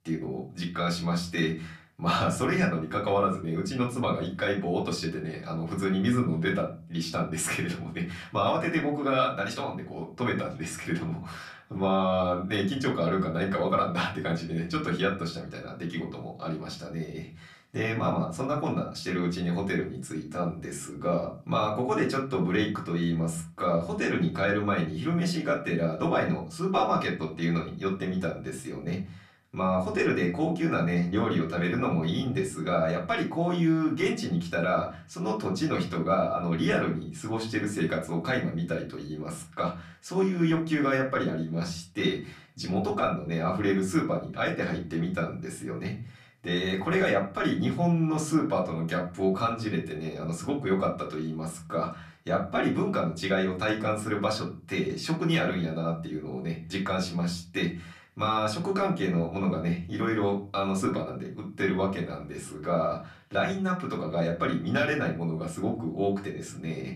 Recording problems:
off-mic speech; far
room echo; very slight; dies away in 0.3 s

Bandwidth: 14.5 kHz